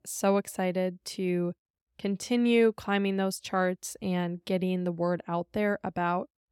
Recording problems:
none

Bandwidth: 17 kHz